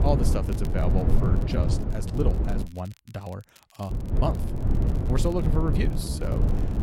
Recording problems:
wind noise on the microphone; heavy; until 2.5 s and from 4 s on; 3 dB below the speech
crackle, like an old record; faint; 25 dB below the speech
uneven, jittery; strongly; from 0.5 to 6.5 s

